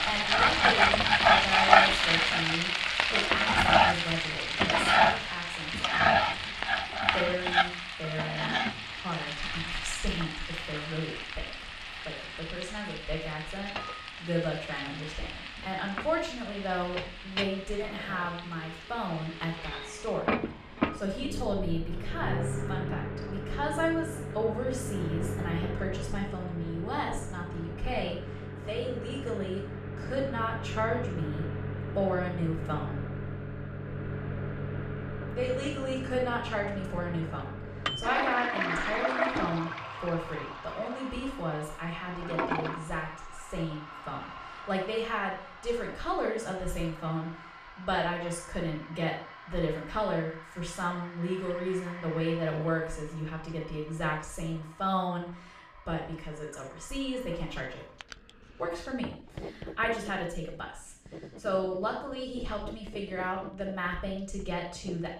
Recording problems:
off-mic speech; far
room echo; noticeable; dies away in 0.5 s
household noises; very loud; throughout; 5 dB above the speech

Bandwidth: 14.5 kHz